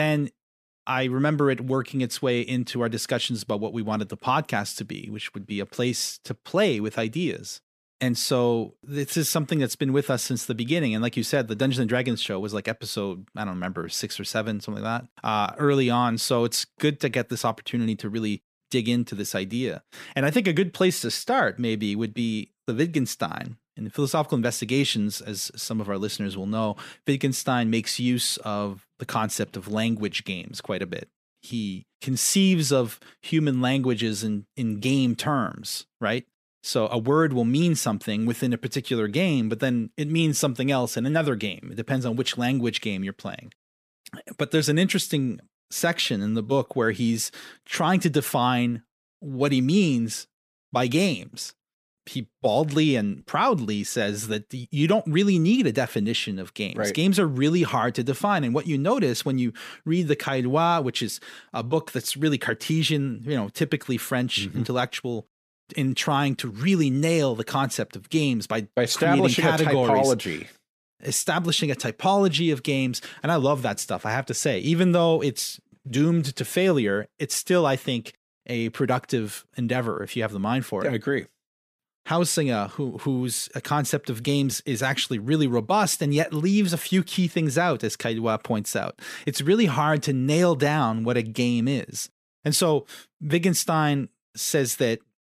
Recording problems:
abrupt cut into speech; at the start

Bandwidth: 15 kHz